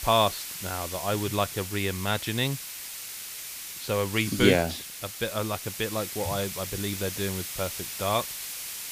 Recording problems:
hiss; loud; throughout; 6 dB below the speech

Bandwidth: 15 kHz